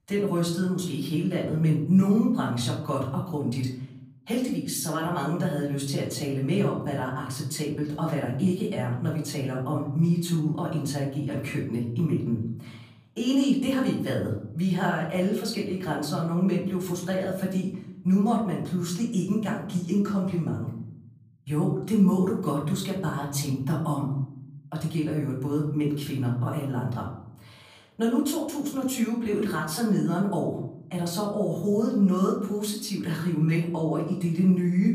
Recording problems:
off-mic speech; far
room echo; slight; dies away in 0.8 s

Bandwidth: 15 kHz